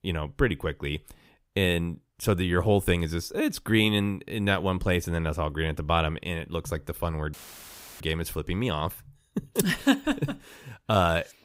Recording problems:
audio cutting out; filled with static; at 7.5 s for 0.5 s

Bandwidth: 15.5 kHz